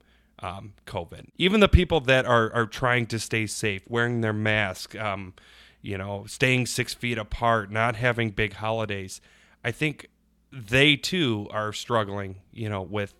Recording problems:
none

